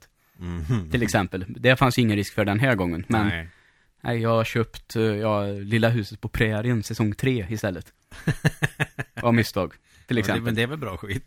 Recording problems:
none

